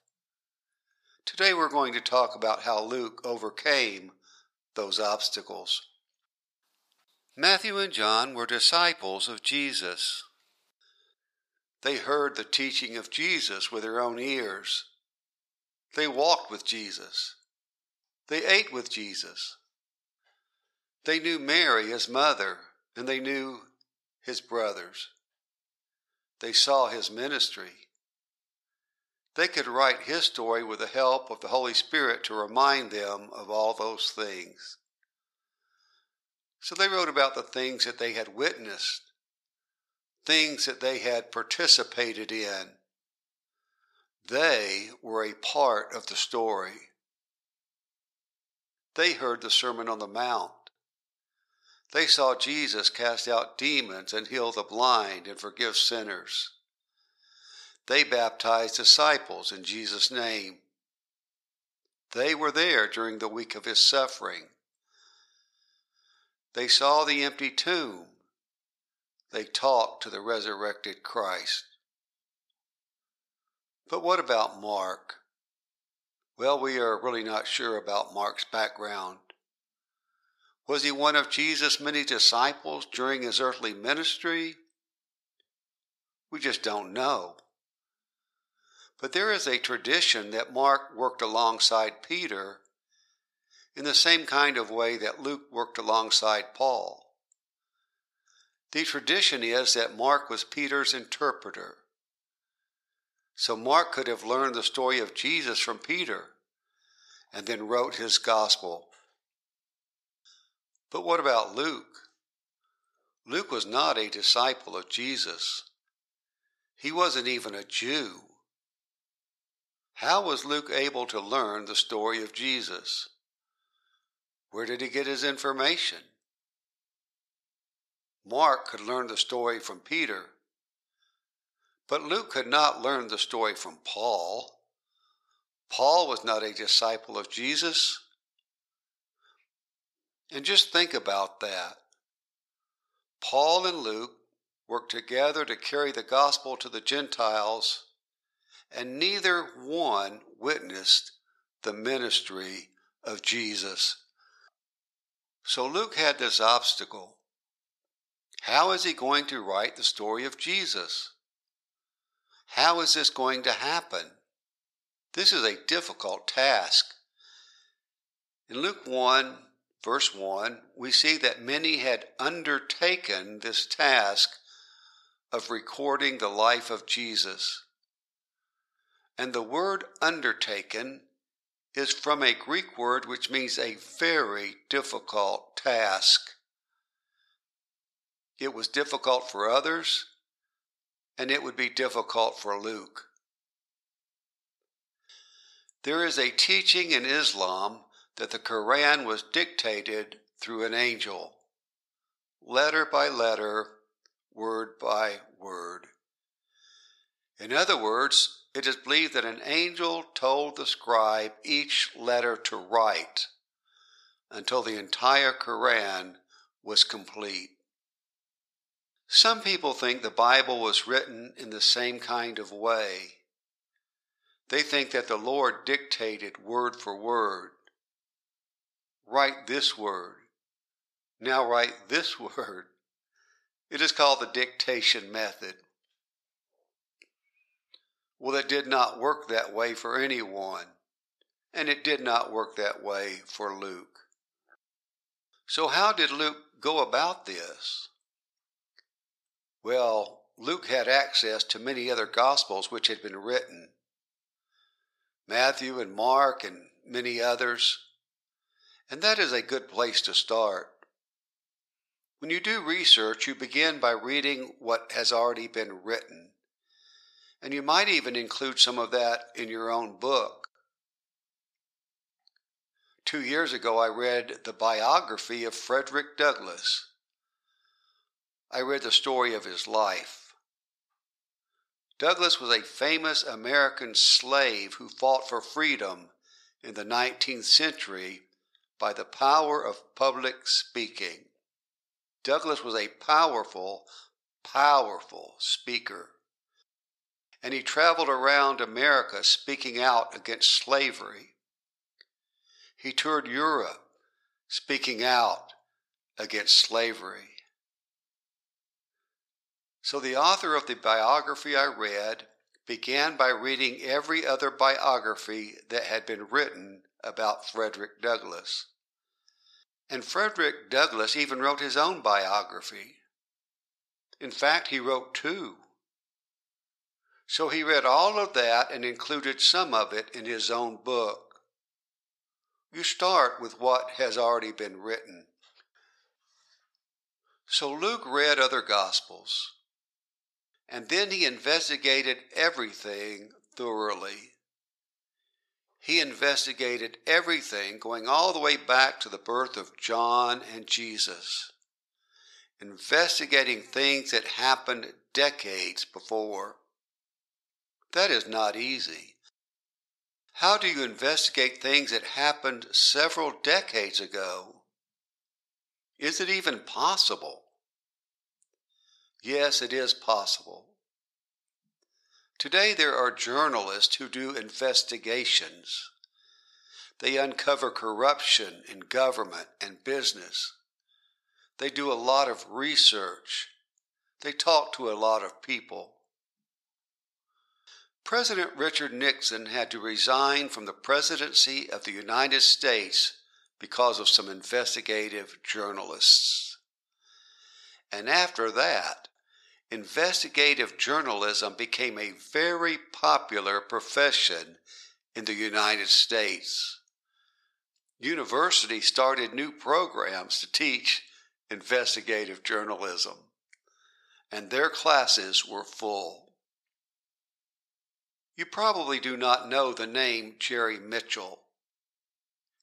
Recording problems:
thin; very; fading below 700 Hz

